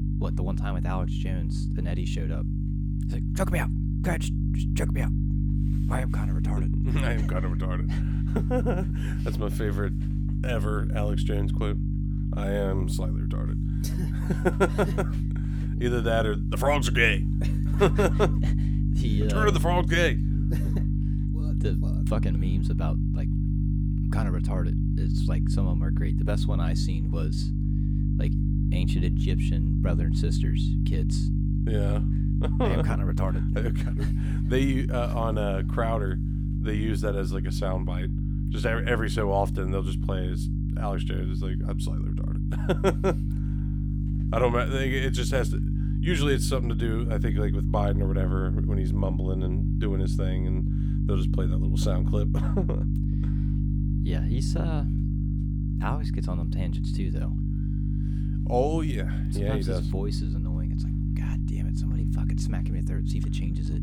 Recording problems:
electrical hum; loud; throughout; 50 Hz, 7 dB below the speech

